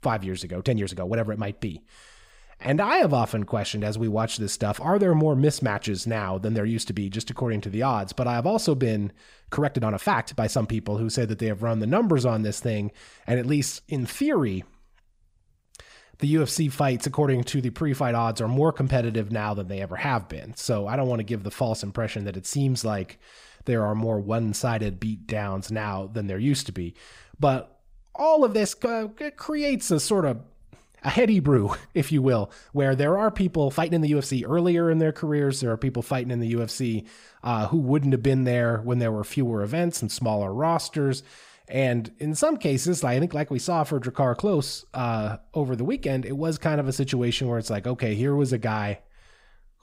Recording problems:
uneven, jittery; strongly; from 0.5 to 43 s

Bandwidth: 15.5 kHz